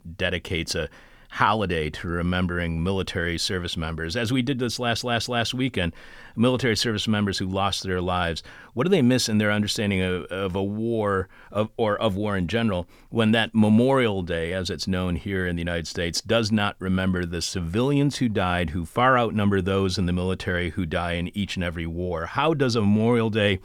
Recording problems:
audio stuttering; at 4.5 s

